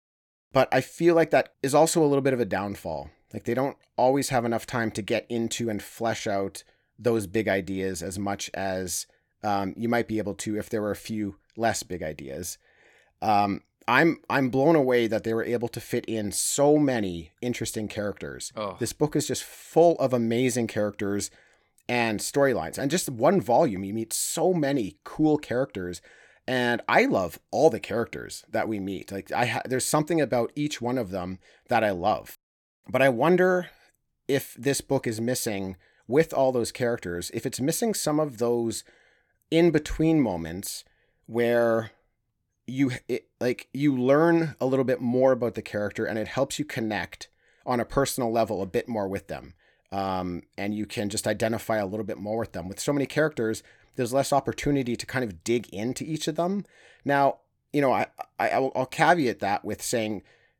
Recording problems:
none

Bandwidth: 18 kHz